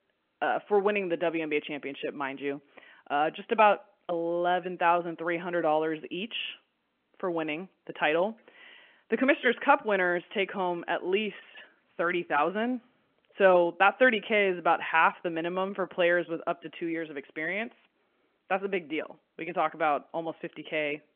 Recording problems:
phone-call audio

